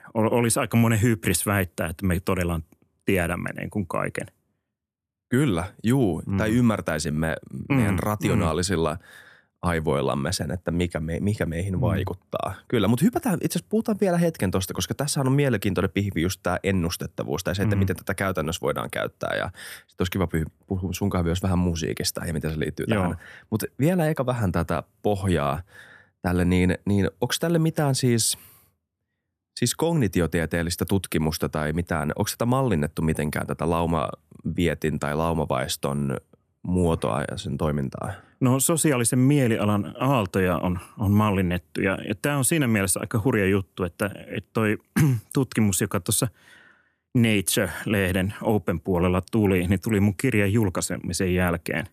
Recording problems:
none

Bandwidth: 14.5 kHz